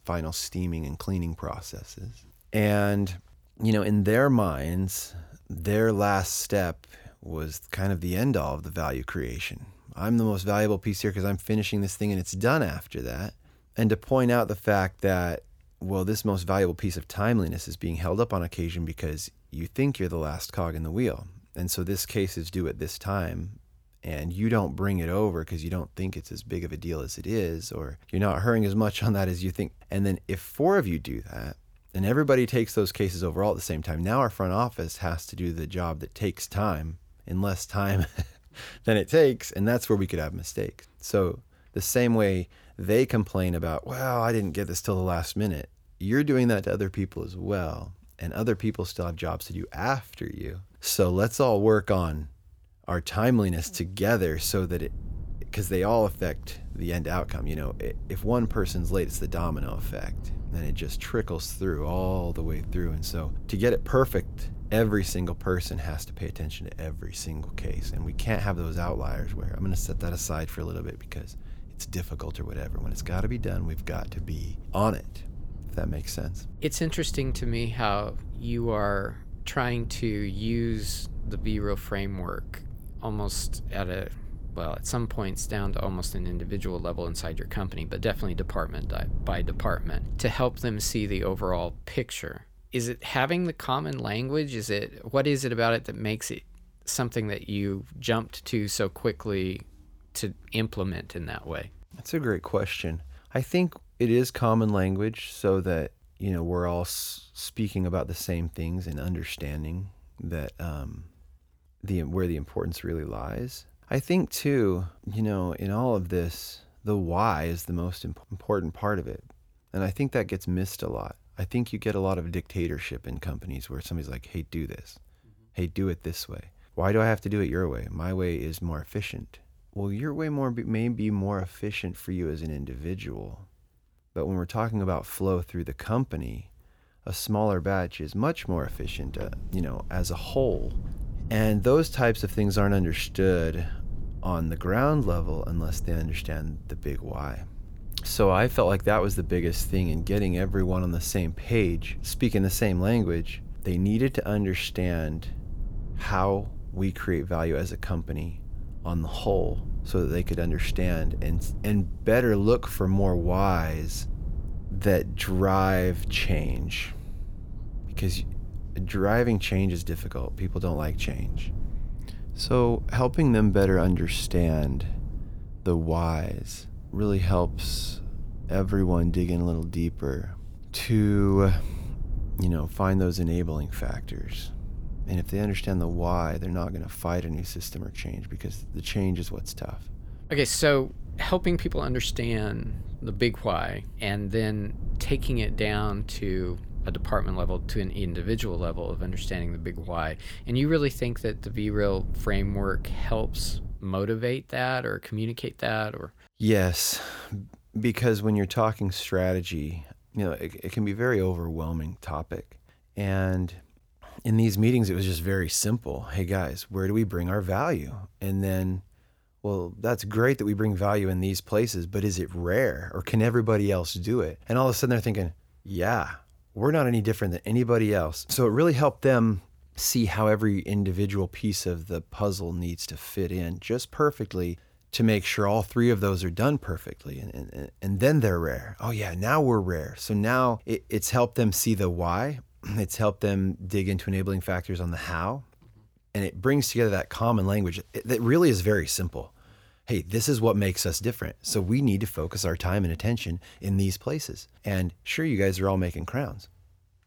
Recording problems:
low rumble; faint; from 54 s to 1:32 and from 2:18 to 3:24; 20 dB below the speech

